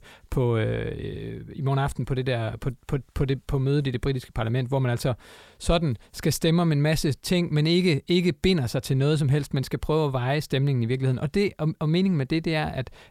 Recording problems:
none

